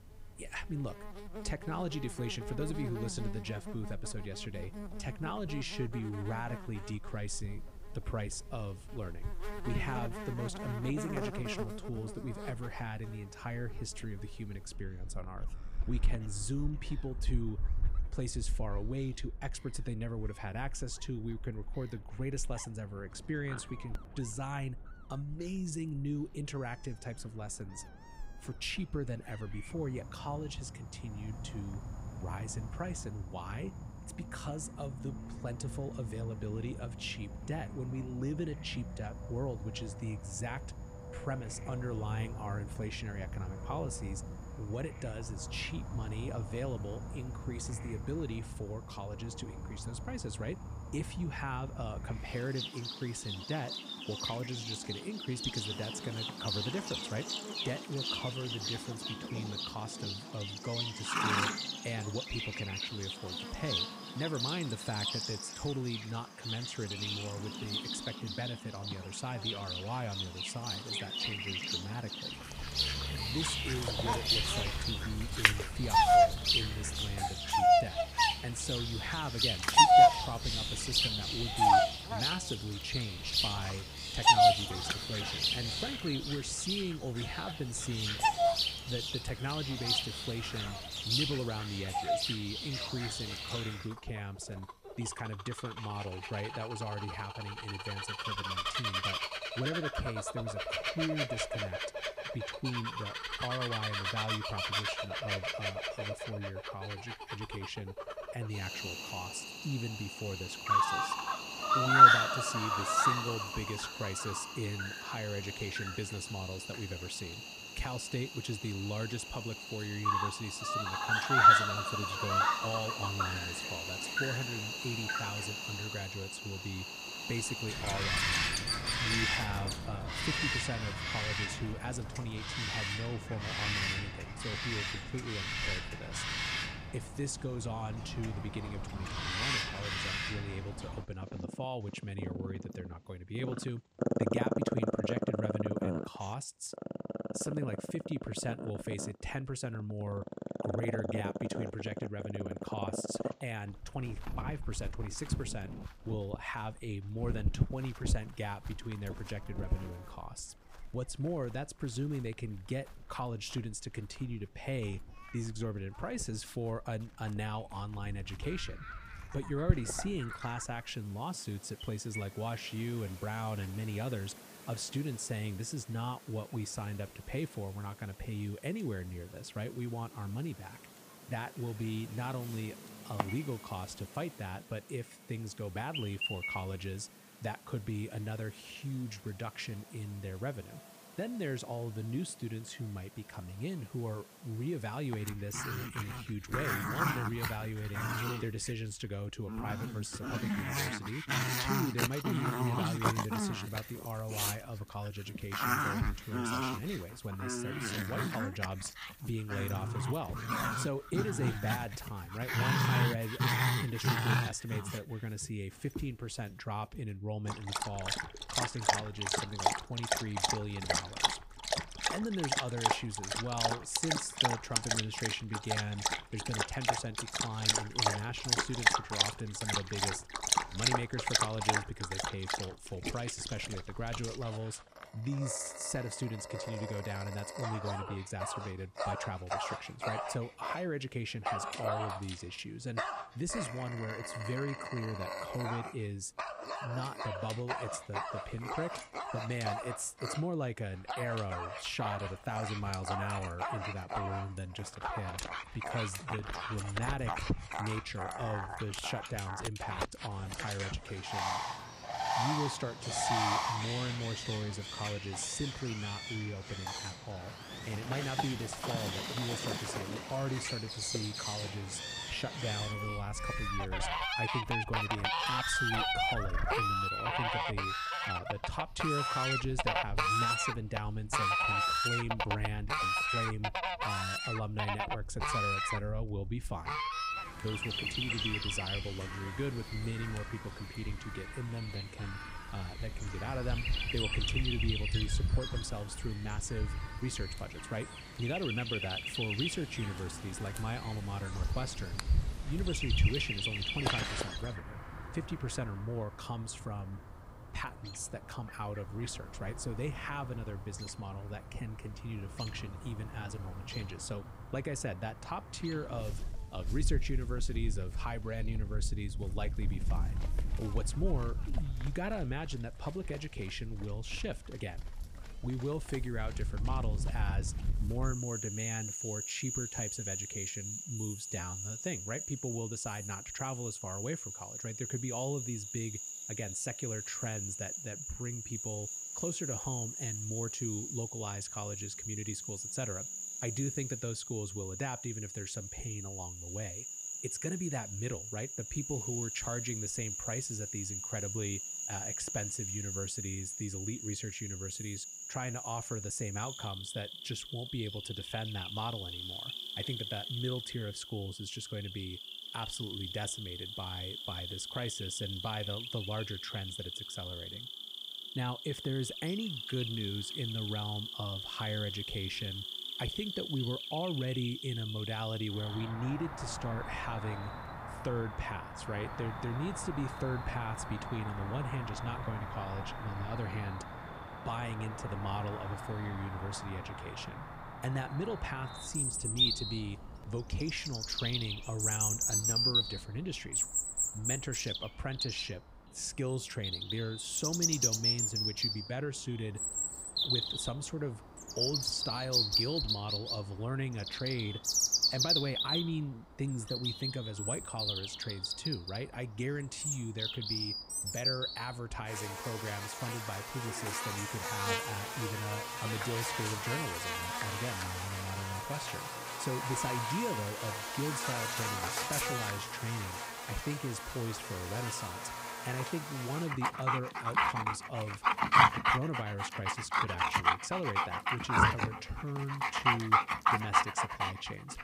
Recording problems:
animal sounds; very loud; throughout; 5 dB above the speech

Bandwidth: 15.5 kHz